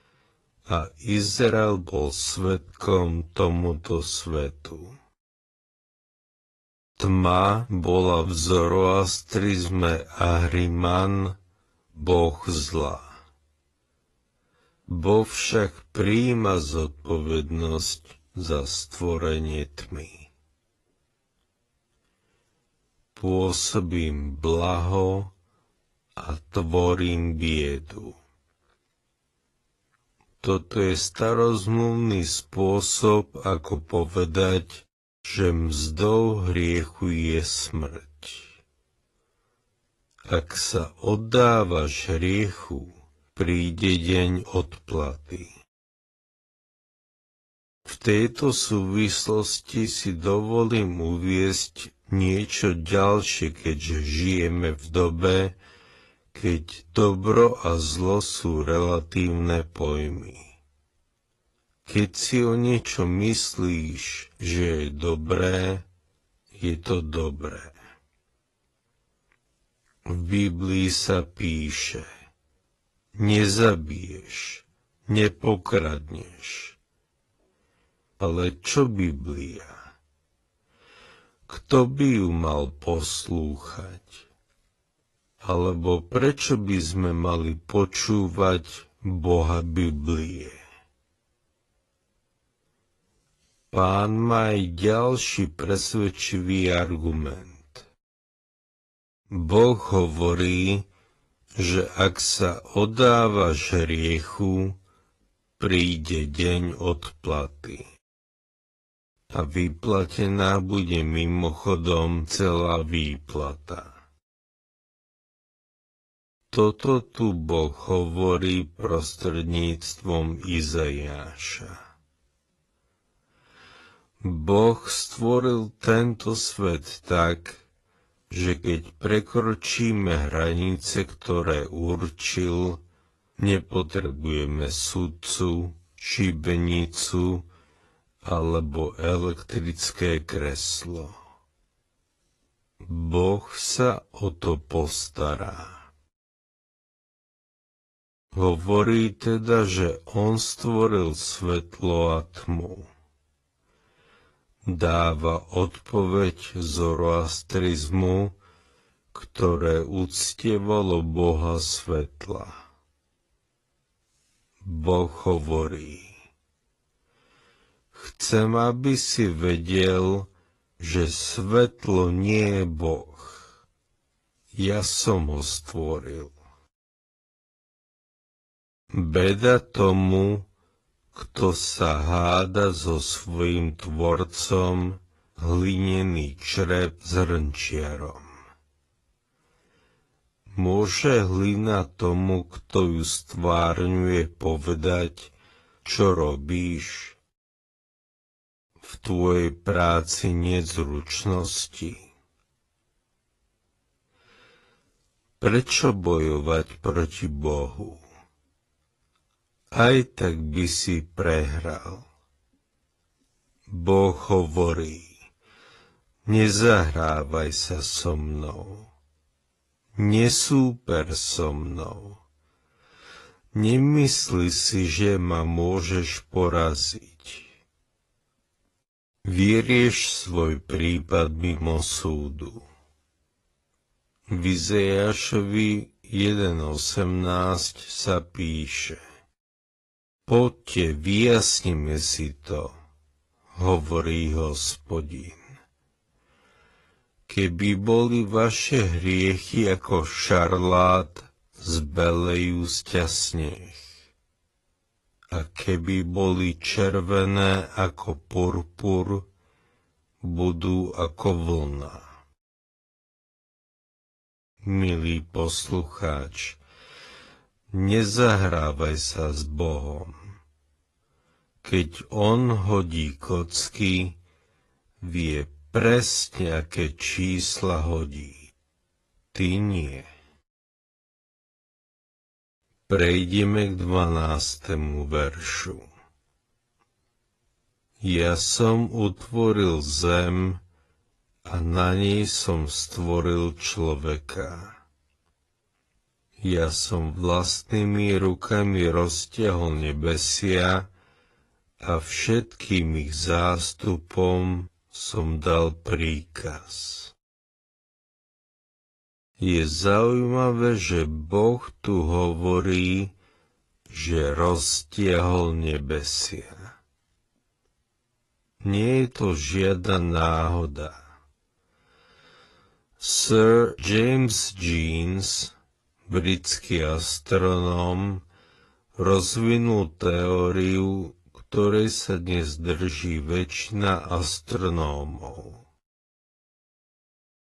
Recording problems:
wrong speed, natural pitch; too slow; 0.5 times normal speed
garbled, watery; slightly; nothing above 11 kHz

